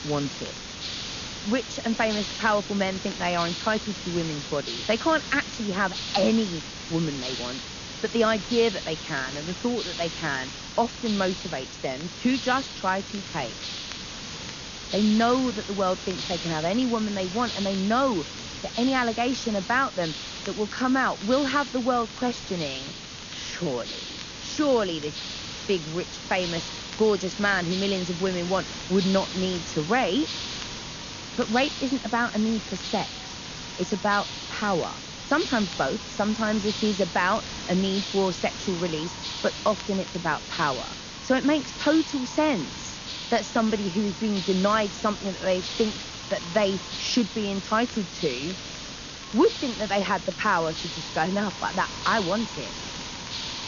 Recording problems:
high frequencies cut off; noticeable; nothing above 6.5 kHz
echo of what is said; faint; from 26 s on; 490 ms later, 25 dB below the speech
garbled, watery; slightly
hiss; loud; throughout; 7 dB below the speech
crackle, like an old record; faint; 25 dB below the speech

